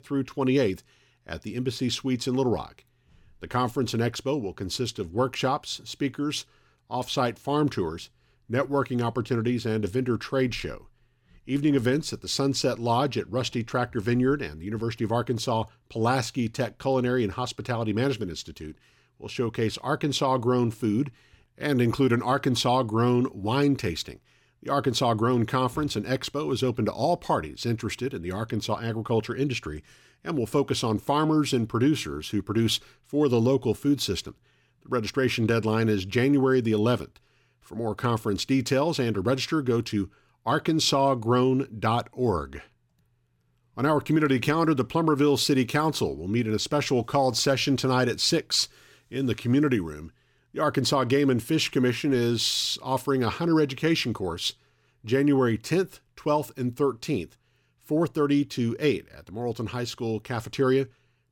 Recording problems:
none

